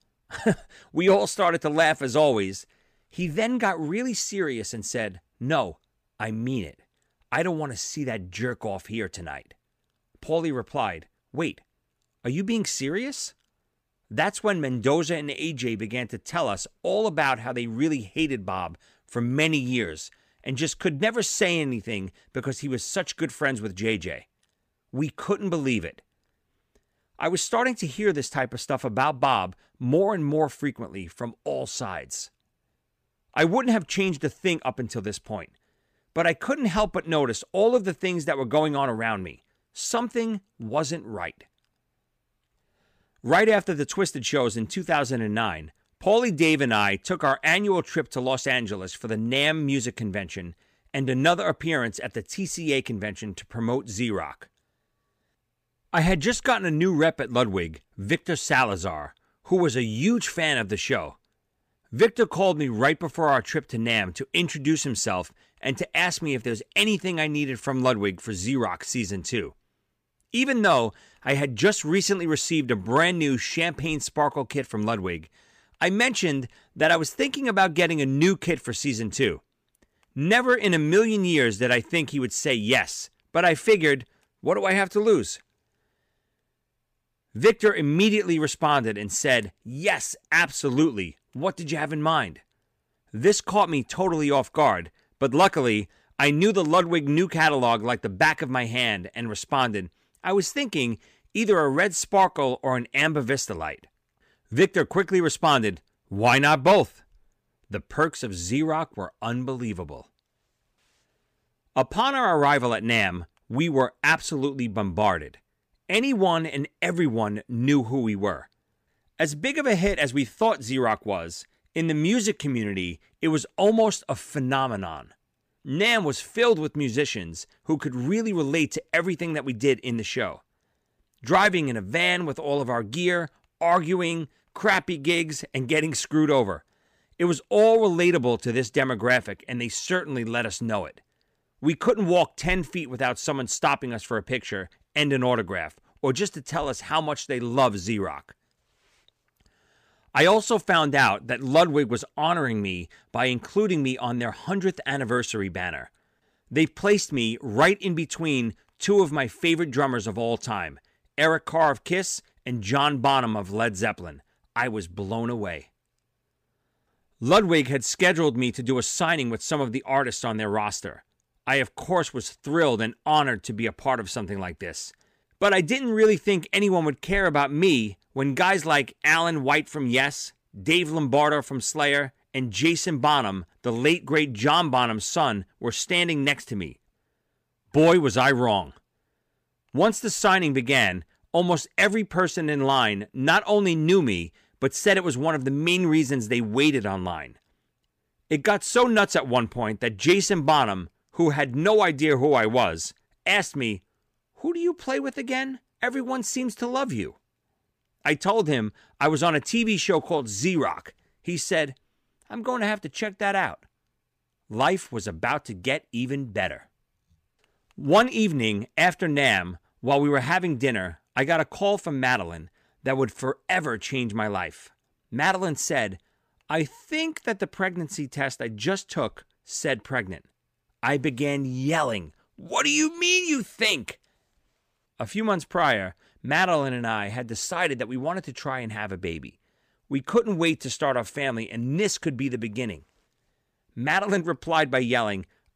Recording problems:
none

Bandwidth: 15 kHz